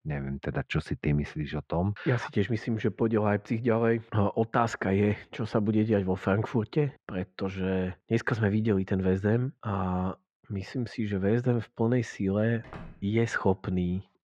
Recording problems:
muffled; very; fading above 2 kHz
door banging; faint; at 13 s; peak 15 dB below the speech

